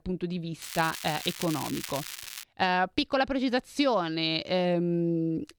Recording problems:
crackling; loud; from 0.5 to 2.5 s; 9 dB below the speech

